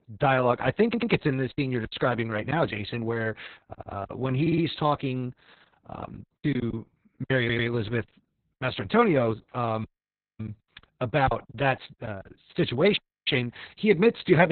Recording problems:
garbled, watery; badly; nothing above 4 kHz
audio stuttering; 4 times, first at 1 s
choppy; very; from 1.5 to 4 s, at 6.5 s and from 10 to 13 s; 9% of the speech affected
audio cutting out; at 10 s for 0.5 s and at 13 s
abrupt cut into speech; at the end

